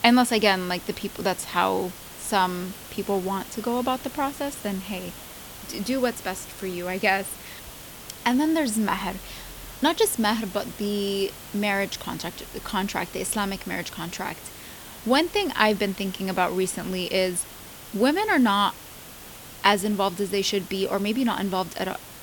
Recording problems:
hiss; noticeable; throughout; 15 dB below the speech

